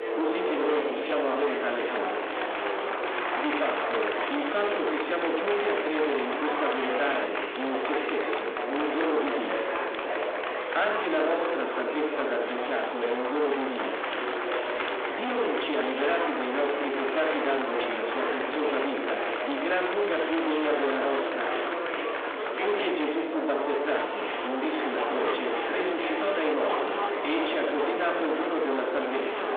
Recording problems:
distortion; heavy; 26% of the sound clipped
off-mic speech; far
room echo; noticeable; dies away in 0.8 s
phone-call audio
murmuring crowd; loud; throughout; 1 dB below the speech

